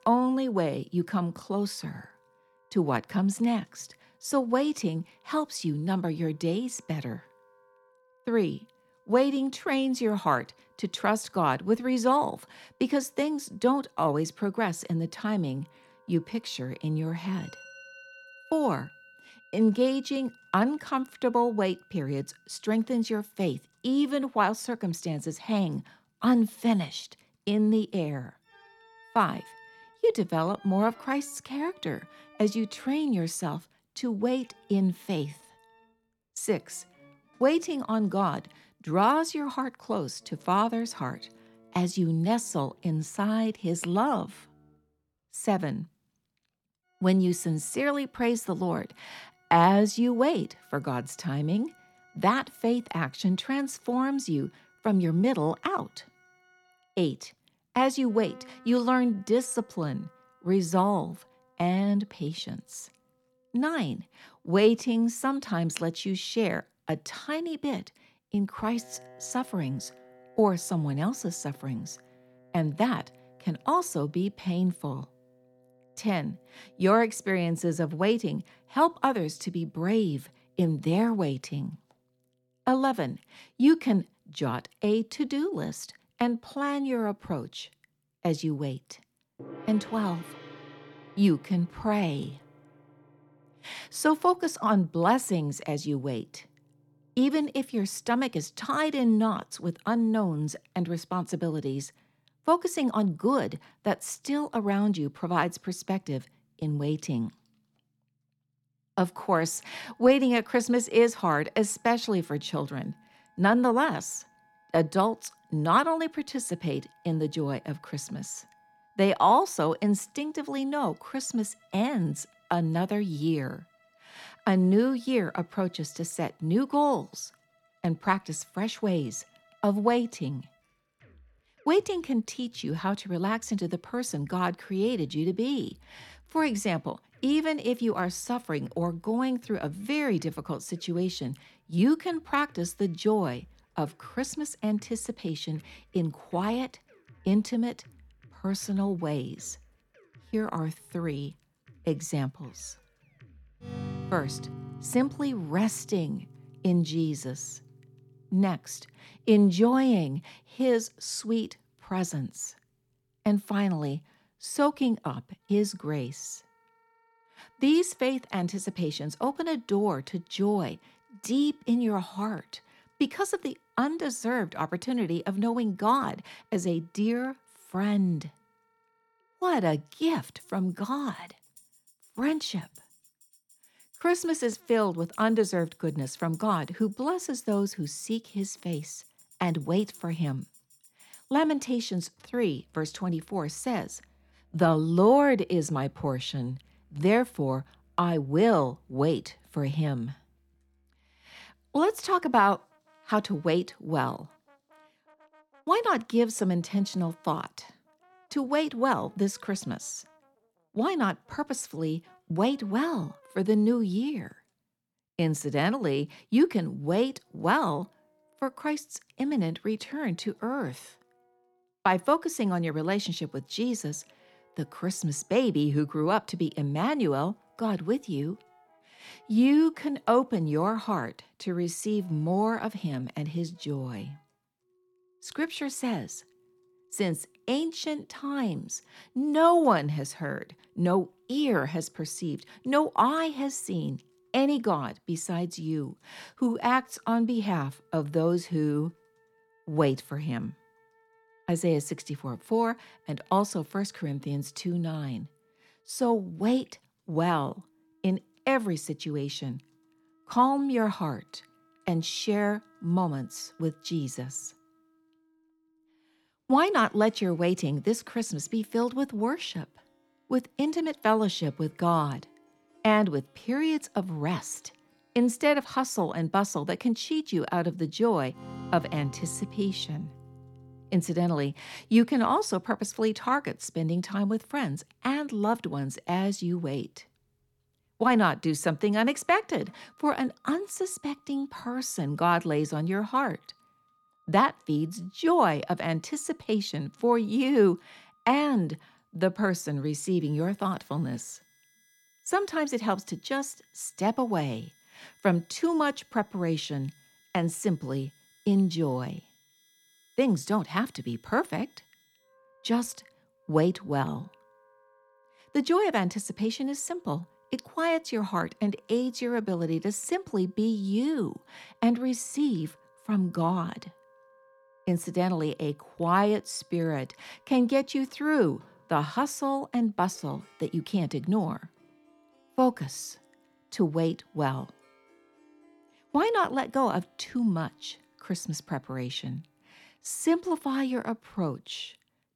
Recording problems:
background music; faint; throughout; 30 dB below the speech

